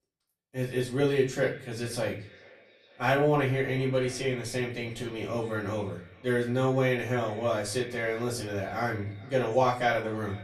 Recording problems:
off-mic speech; far
echo of what is said; faint; throughout; 440 ms later, 20 dB below the speech
room echo; slight; dies away in 0.3 s

